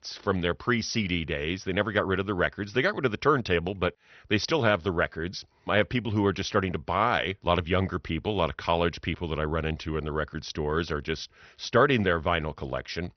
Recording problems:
high frequencies cut off; noticeable; nothing above 6 kHz
garbled, watery; slightly

